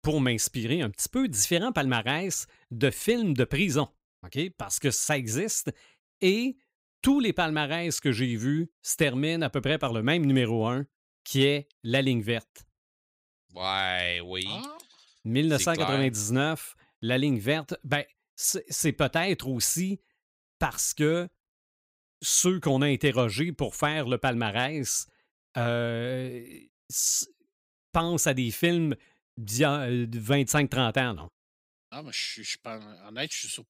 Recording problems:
none

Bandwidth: 15.5 kHz